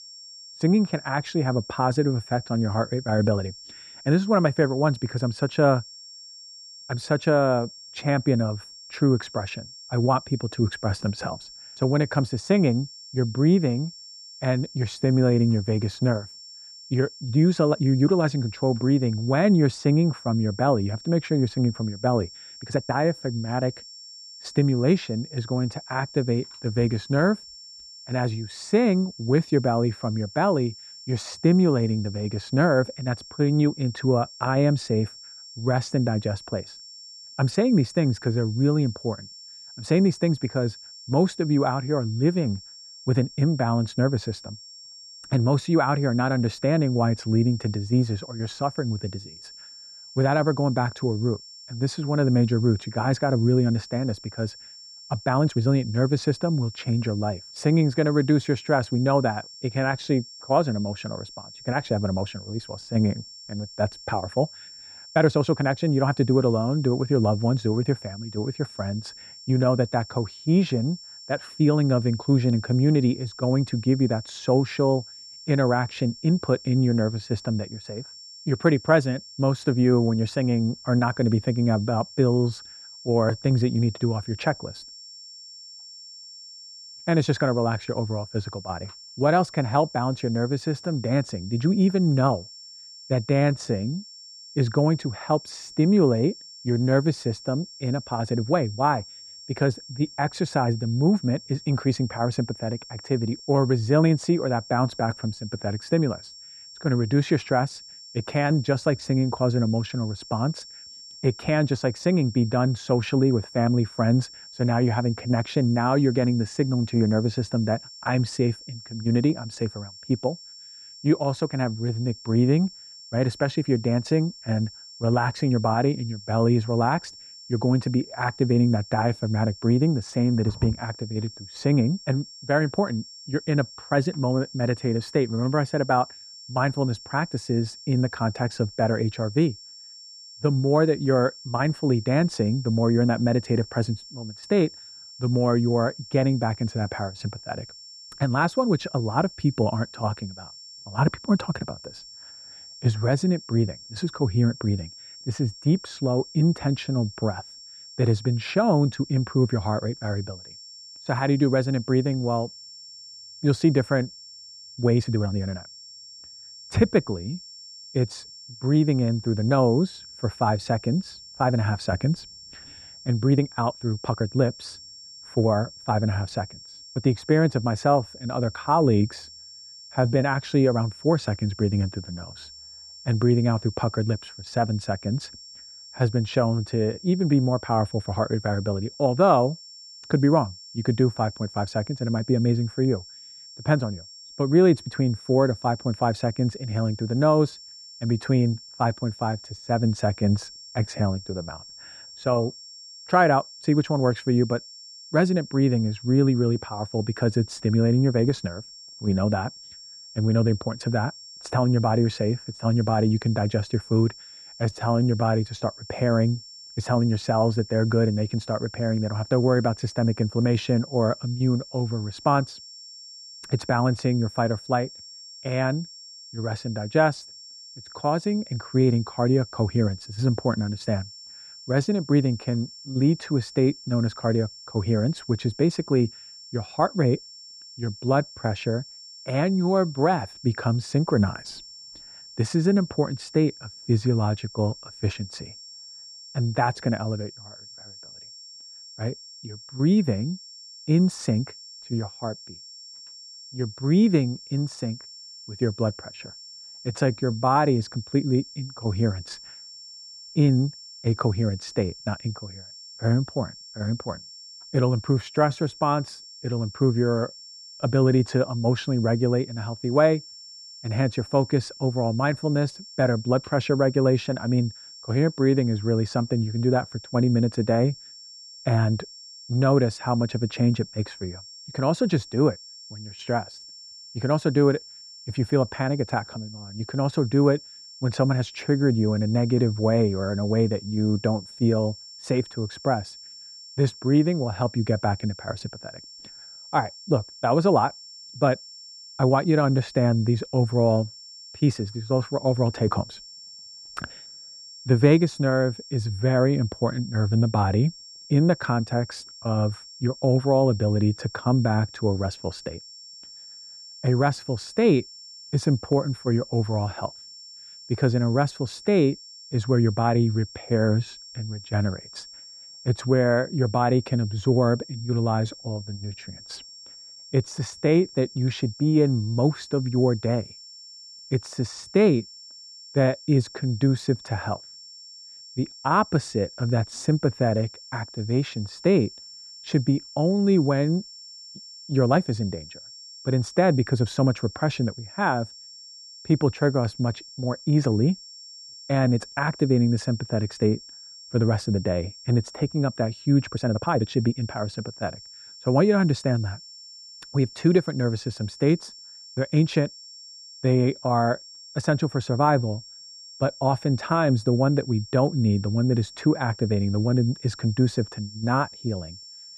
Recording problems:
muffled; very; fading above 2 kHz
high-pitched whine; noticeable; throughout; 5.5 kHz, 15 dB below the speech
uneven, jittery; strongly; from 1.5 s to 5:55

